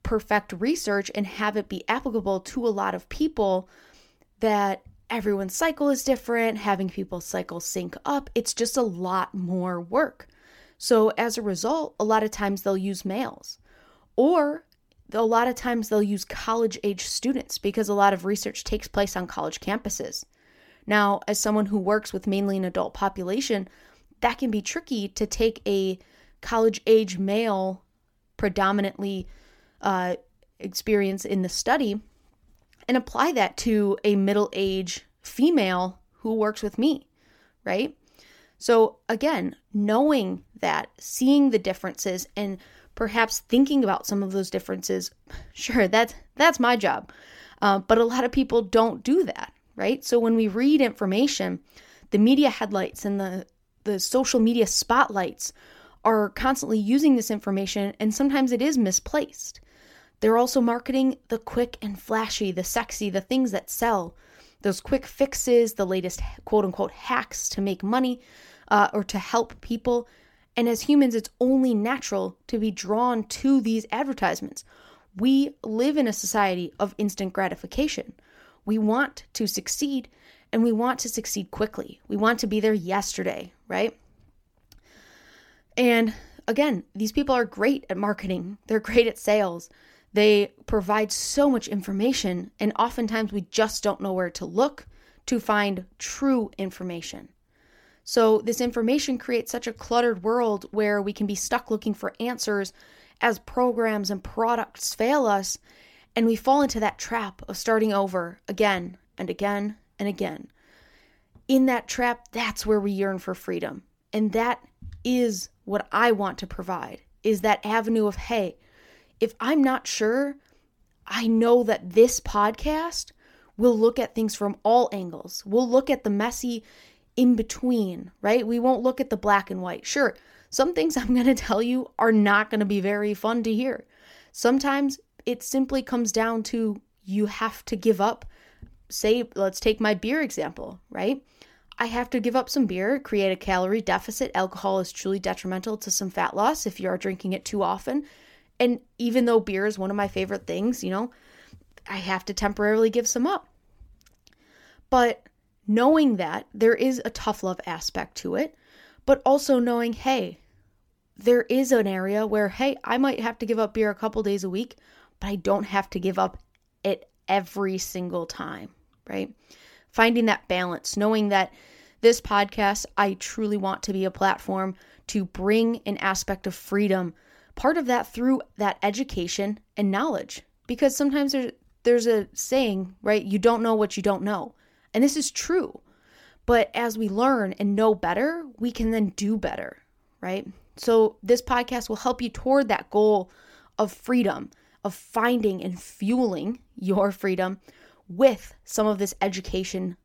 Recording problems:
none

